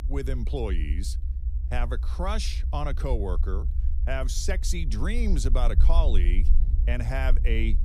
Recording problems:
low rumble; noticeable; throughout; 15 dB below the speech

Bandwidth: 15.5 kHz